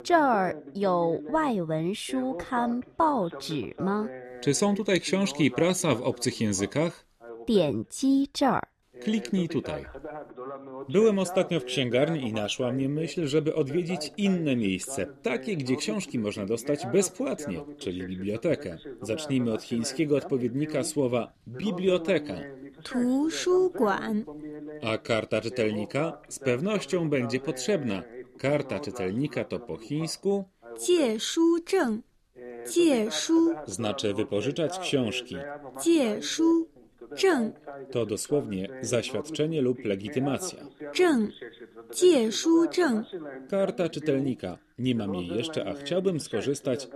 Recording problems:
voice in the background; noticeable; throughout; 15 dB below the speech

